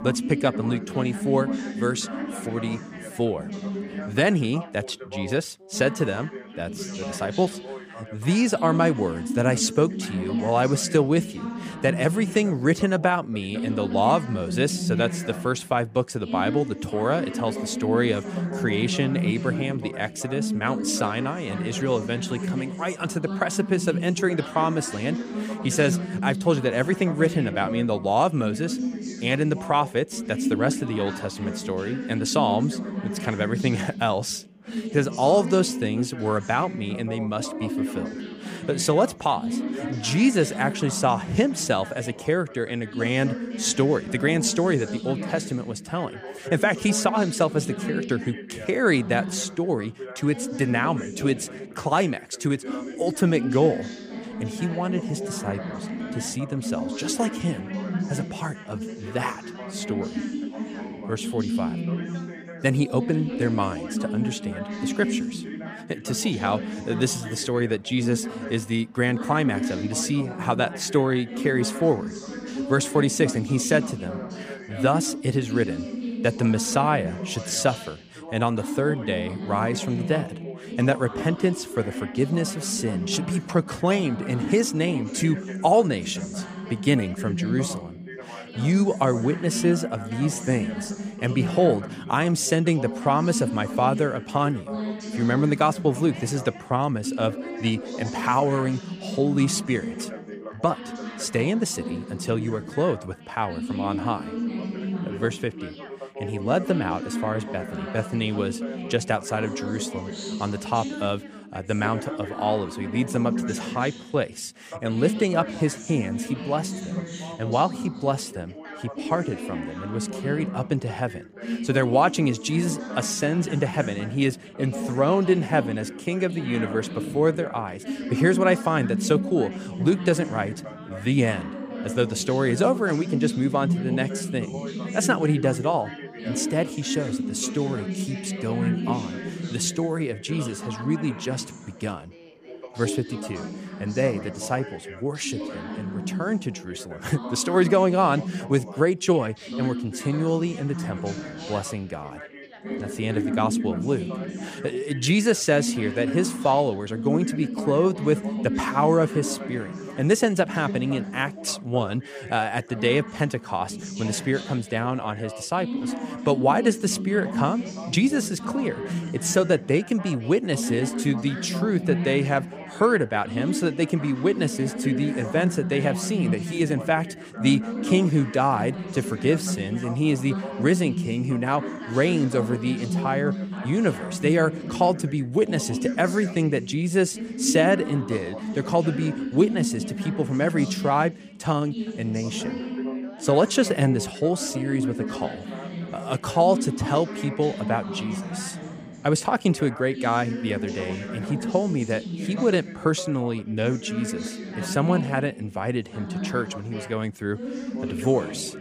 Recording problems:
background chatter; loud; throughout; 3 voices, 7 dB below the speech

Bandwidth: 15 kHz